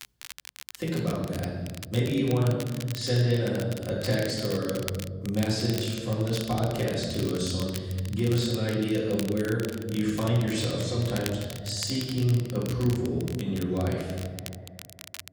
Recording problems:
off-mic speech; far
room echo; noticeable; dies away in 1.5 s
echo of what is said; faint; from 10 s on; 90 ms later, 25 dB below the speech
crackle, like an old record; noticeable; 15 dB below the speech

